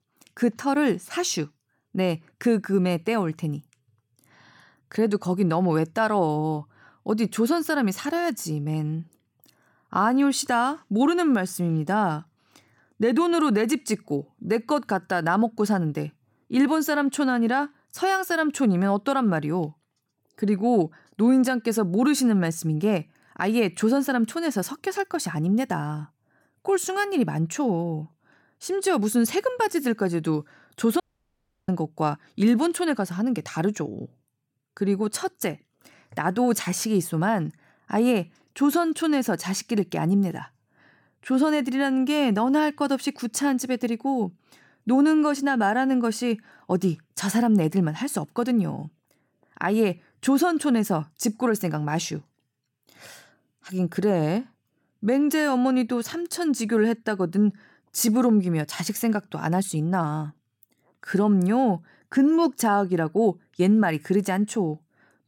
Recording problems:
audio cutting out; at 31 s for 0.5 s

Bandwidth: 17 kHz